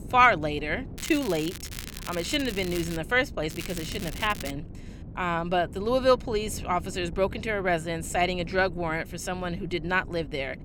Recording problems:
wind noise on the microphone; occasional gusts; 25 dB below the speech
crackling; noticeable; from 1 to 3 s and from 3.5 to 4.5 s; 10 dB below the speech

